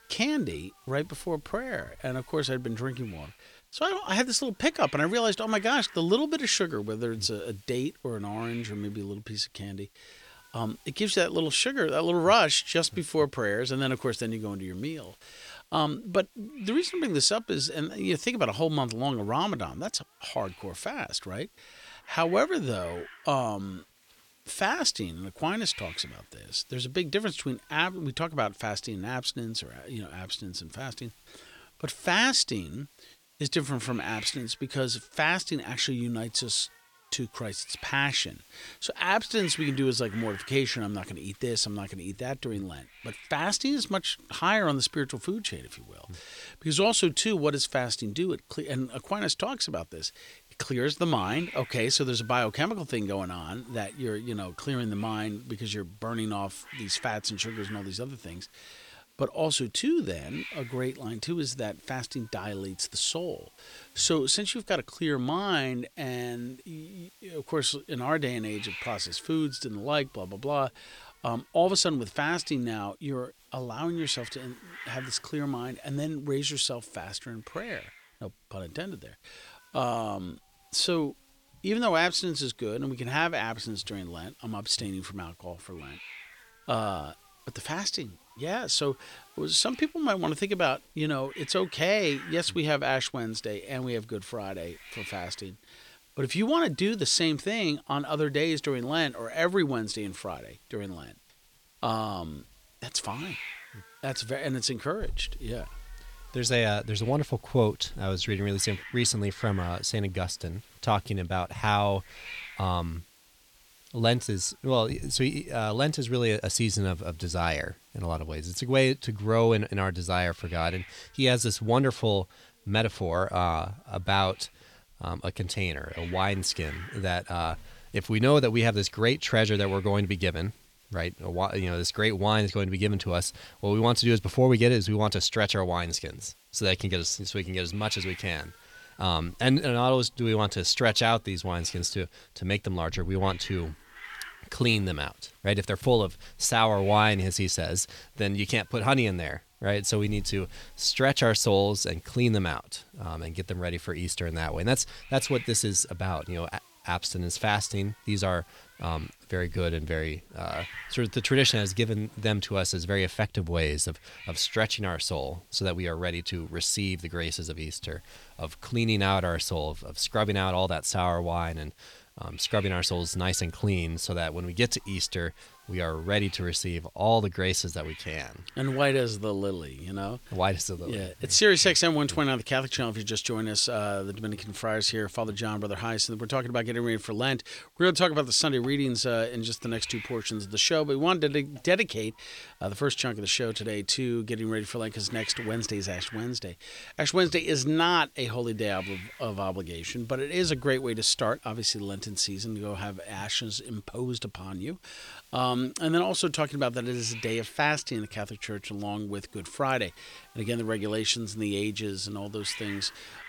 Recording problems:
hiss; faint; throughout; 20 dB below the speech

